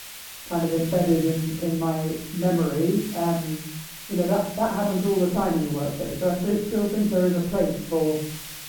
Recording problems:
off-mic speech; far
muffled; very; fading above 2 kHz
room echo; noticeable; dies away in 0.6 s
hiss; noticeable; throughout; 10 dB below the speech

